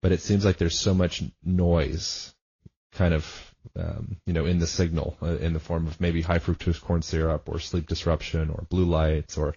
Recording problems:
high frequencies cut off; noticeable; nothing above 6.5 kHz
garbled, watery; slightly

